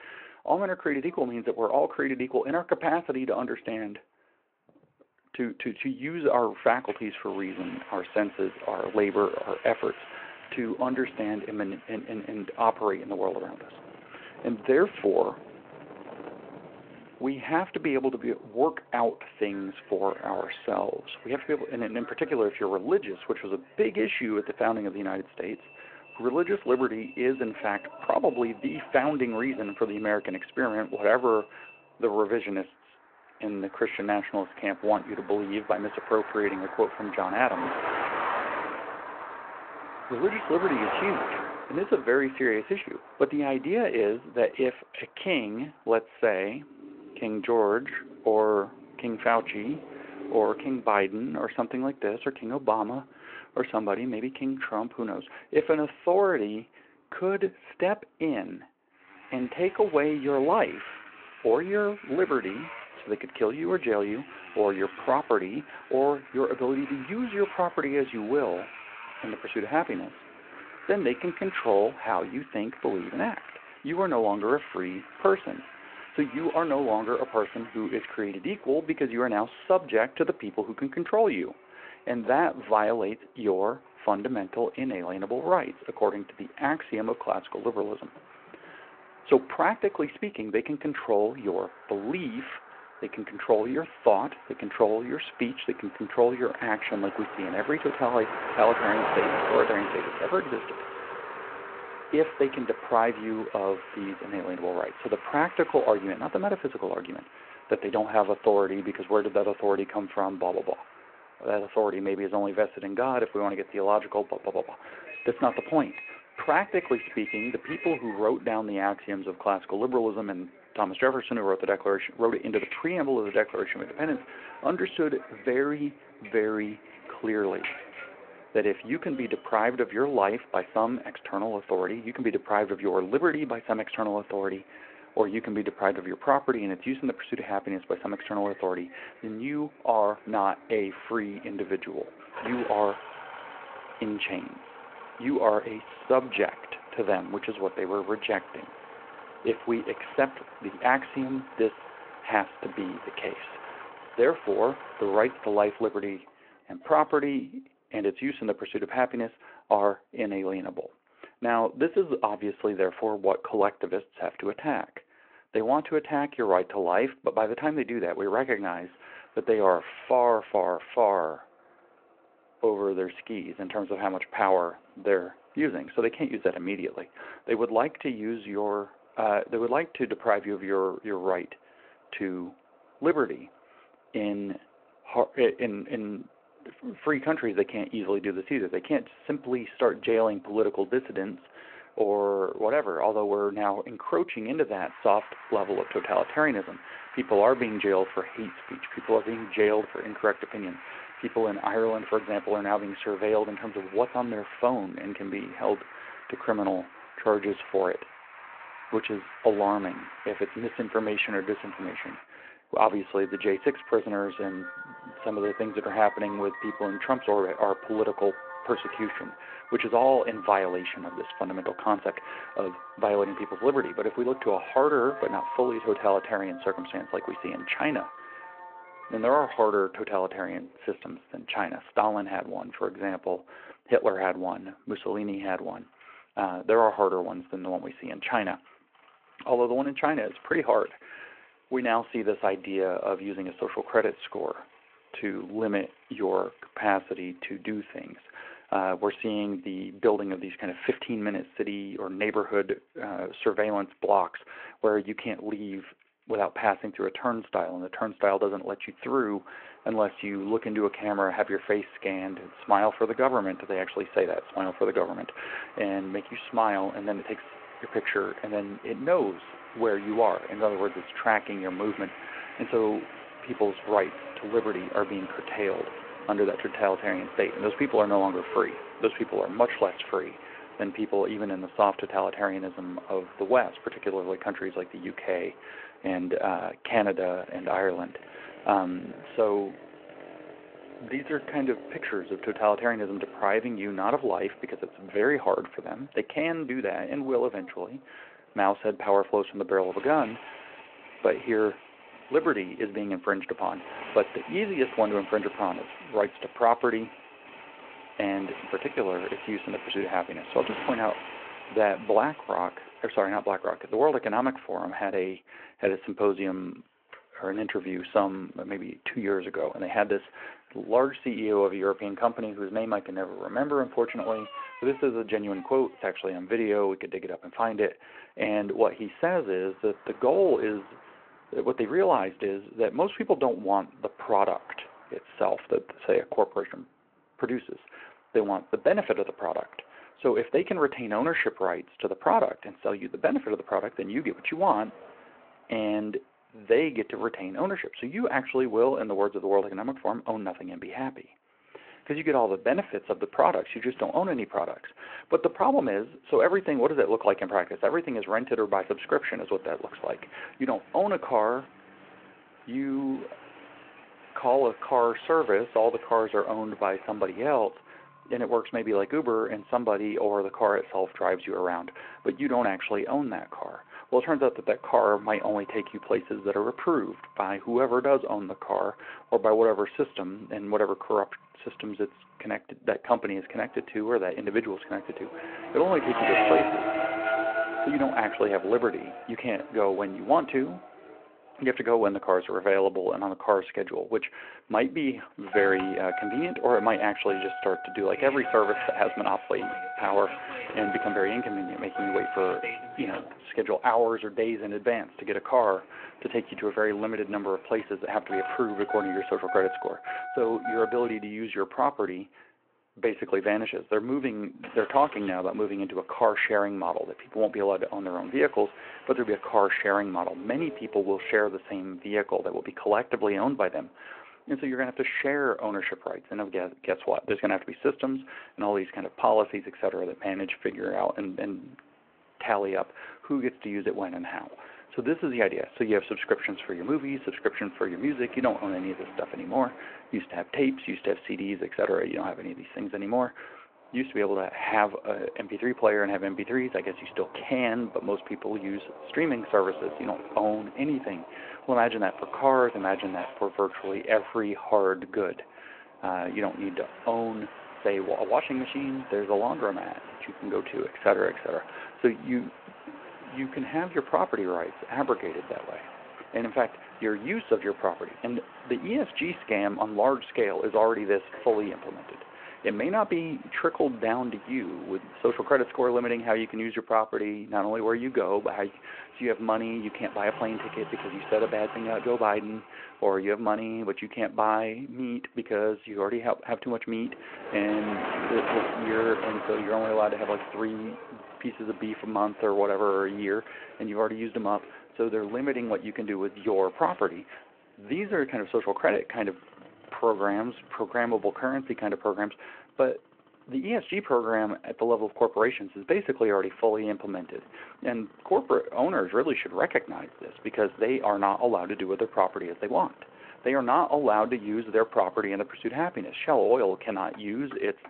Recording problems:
phone-call audio
traffic noise; noticeable; throughout; 10 dB below the speech

